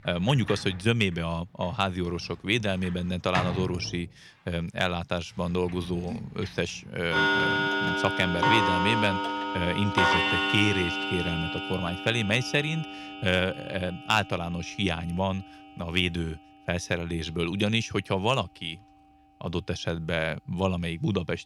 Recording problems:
household noises; very loud; throughout; 1 dB above the speech

